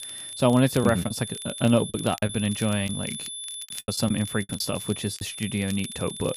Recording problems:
high-pitched whine; loud; throughout; 3.5 kHz, 8 dB below the speech
crackle, like an old record; faint; 20 dB below the speech
choppy; very; from 1 to 3 s and from 4 to 5 s; 11% of the speech affected

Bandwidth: 14.5 kHz